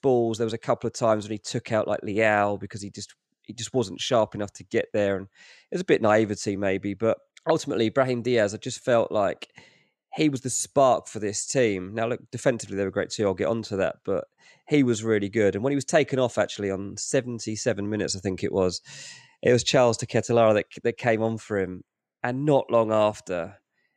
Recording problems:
none

